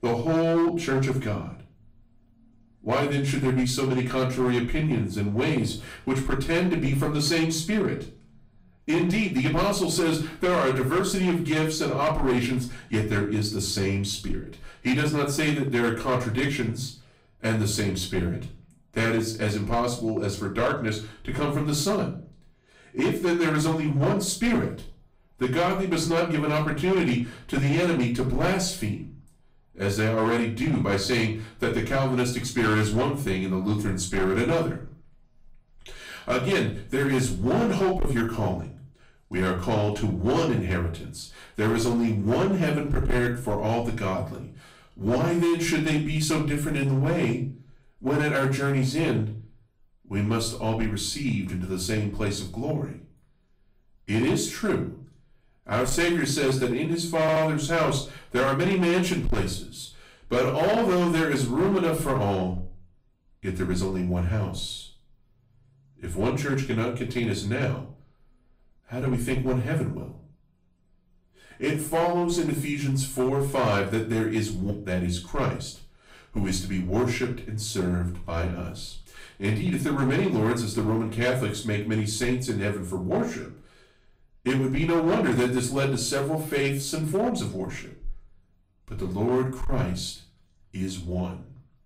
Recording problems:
off-mic speech; far
room echo; slight; dies away in 0.3 s
distortion; slight; 8% of the sound clipped
audio stuttering; at 57 s

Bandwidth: 15.5 kHz